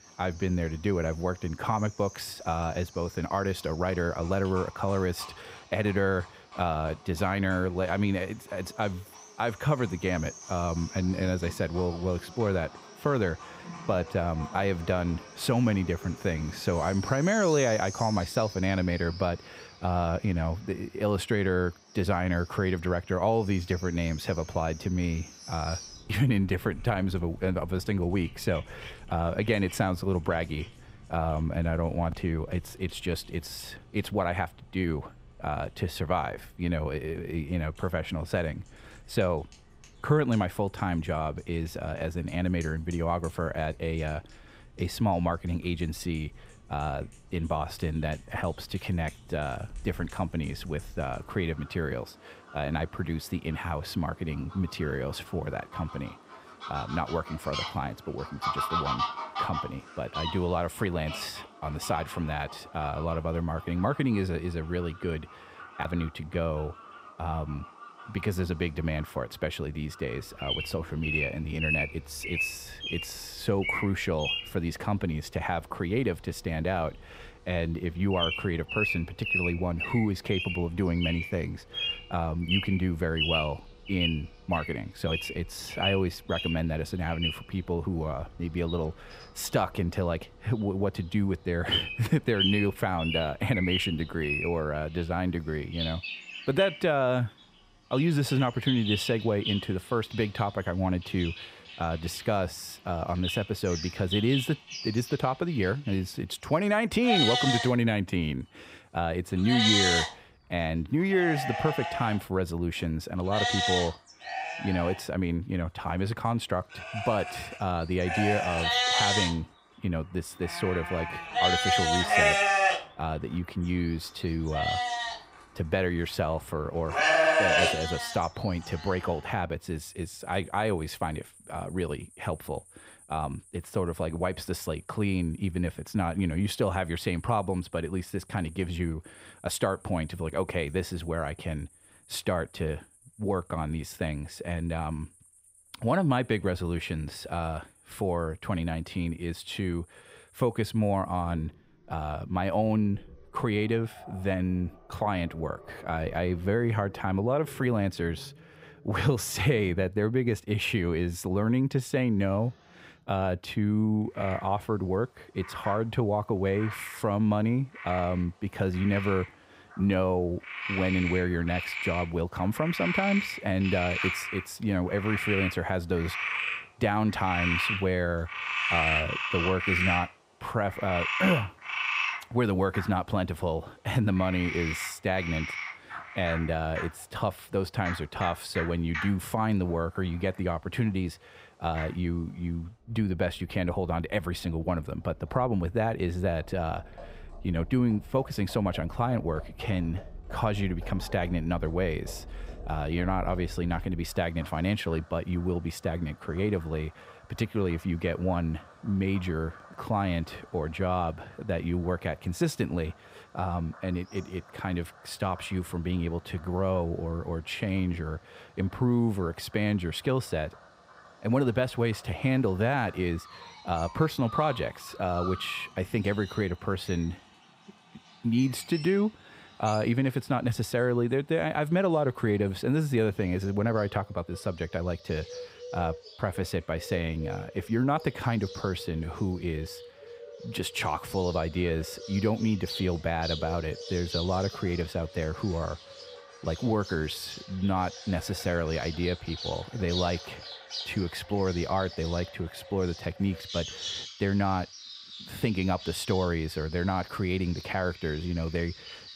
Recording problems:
animal sounds; loud; throughout; 3 dB below the speech

